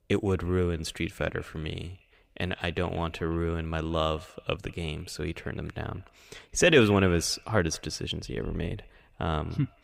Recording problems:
echo of what is said; faint; throughout; 180 ms later, 25 dB below the speech

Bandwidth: 15.5 kHz